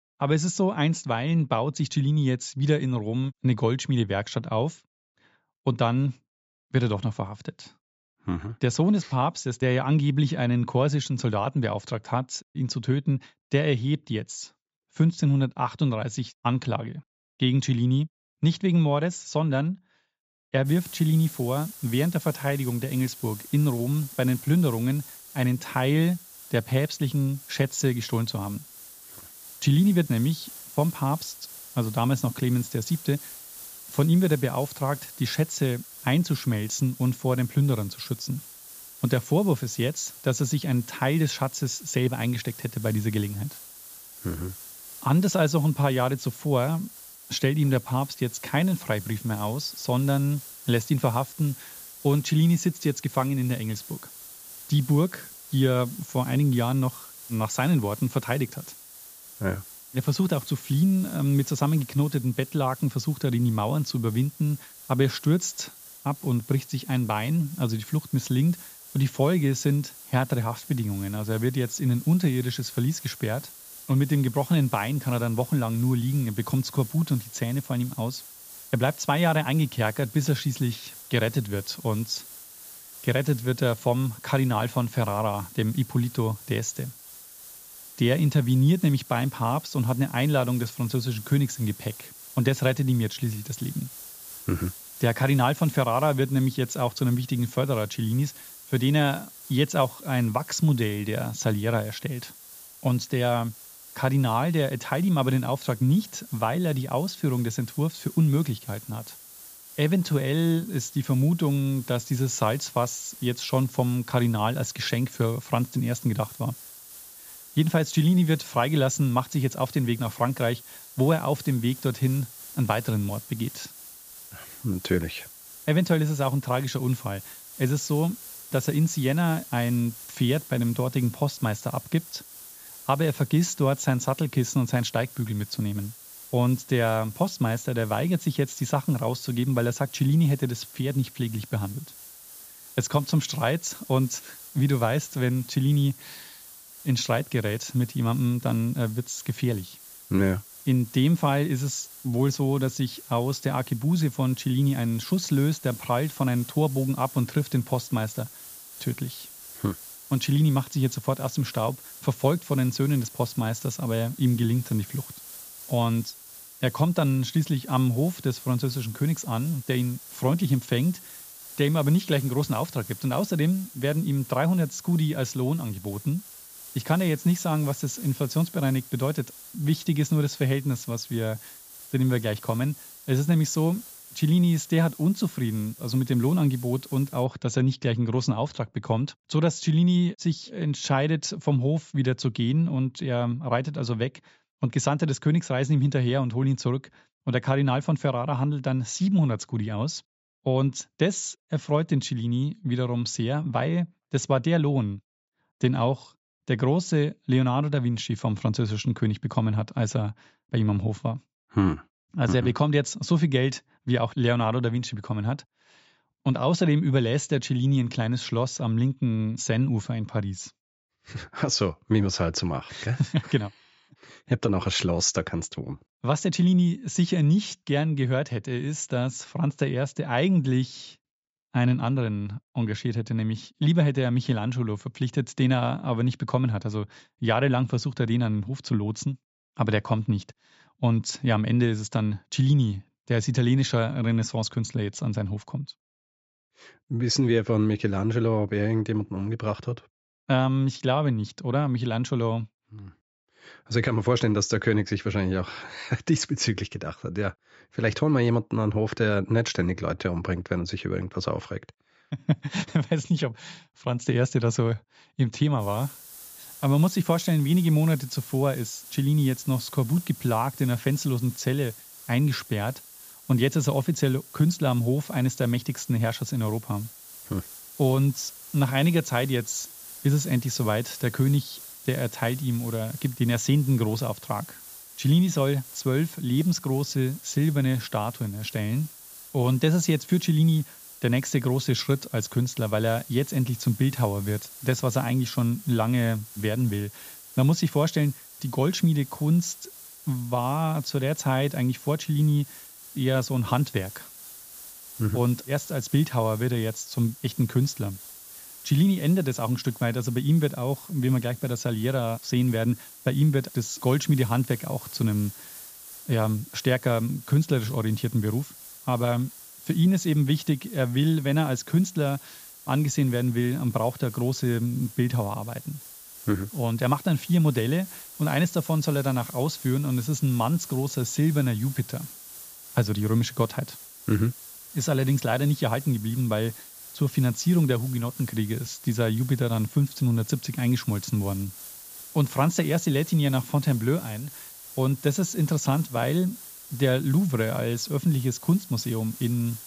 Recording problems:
high frequencies cut off; noticeable; nothing above 8 kHz
hiss; noticeable; from 21 s to 3:07 and from 4:26 on; 15 dB below the speech

